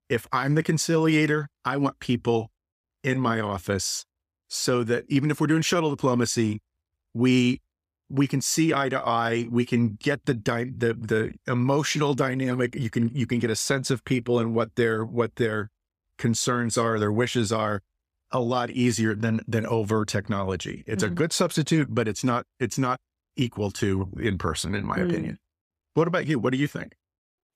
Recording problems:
none

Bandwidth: 15 kHz